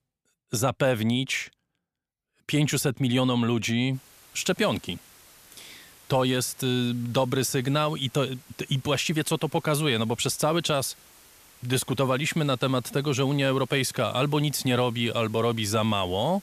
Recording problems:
hiss; faint; from 4 s on; 25 dB below the speech

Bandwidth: 14.5 kHz